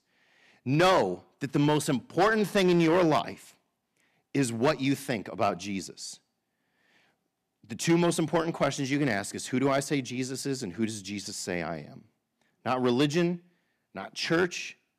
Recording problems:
distortion; slight; 2% of the sound clipped

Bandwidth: 14.5 kHz